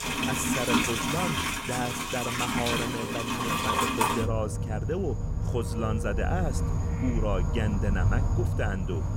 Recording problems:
animal sounds; very loud; throughout; 5 dB above the speech

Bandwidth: 16 kHz